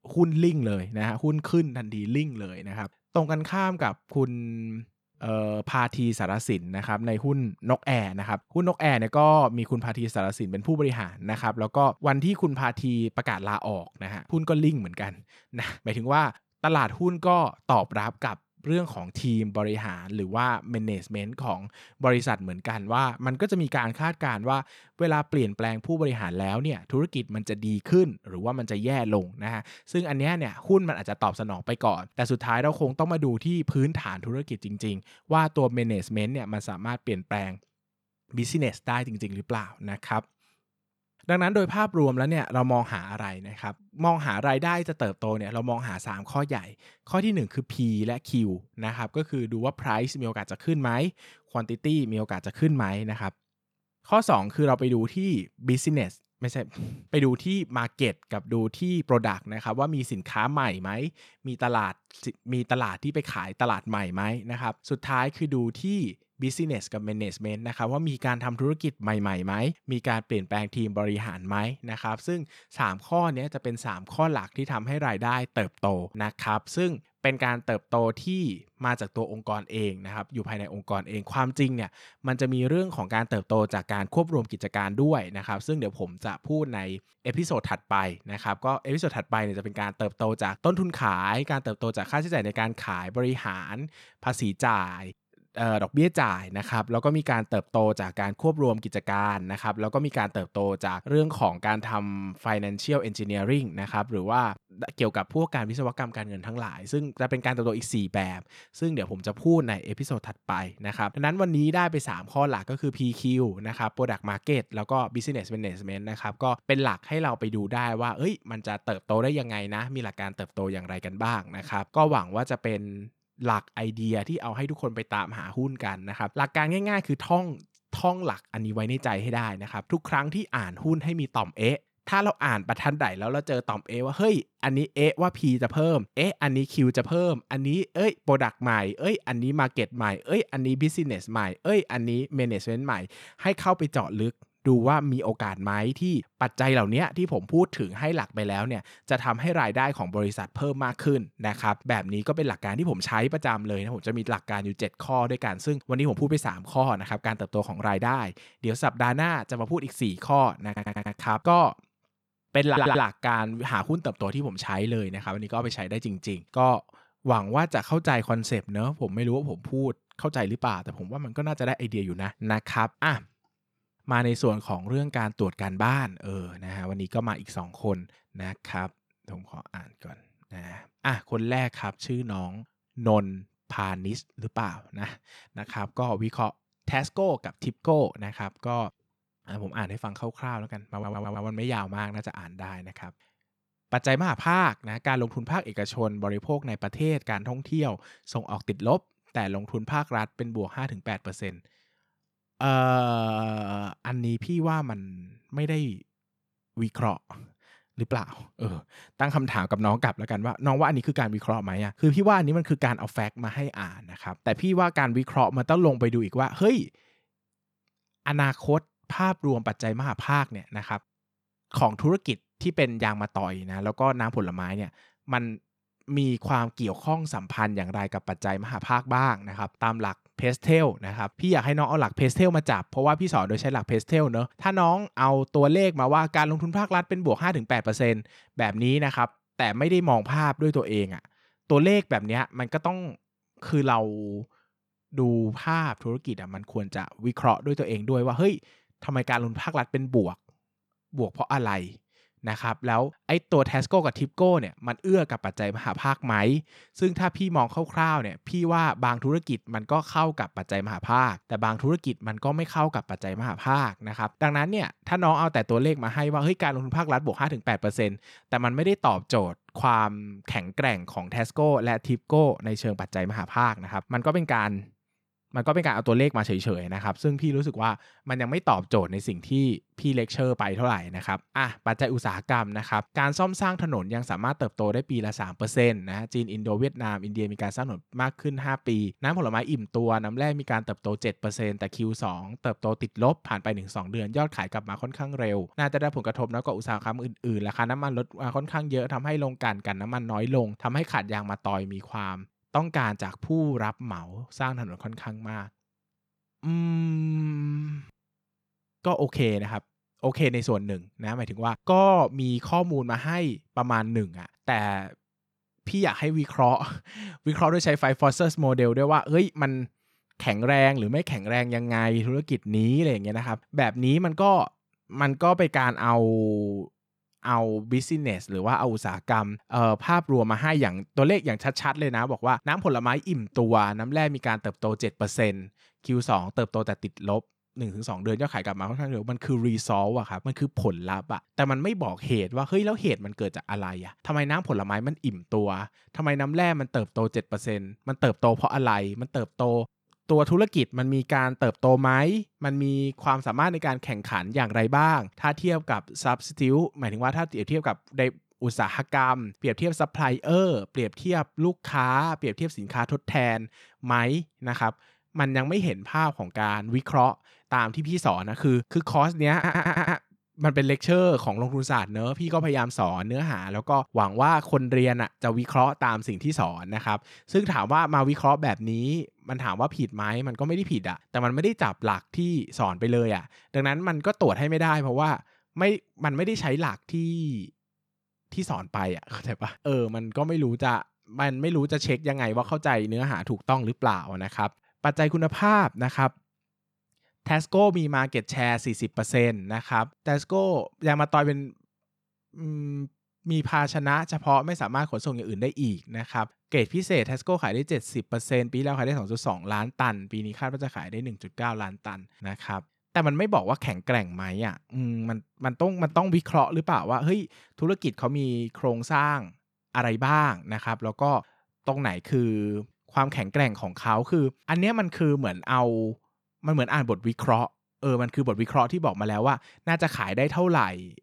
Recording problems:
audio stuttering; 4 times, first at 2:41

